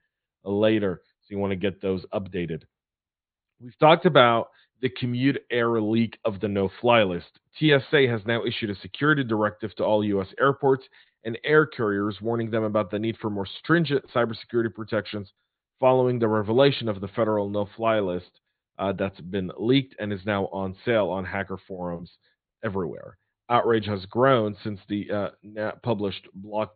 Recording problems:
high frequencies cut off; severe; nothing above 4.5 kHz

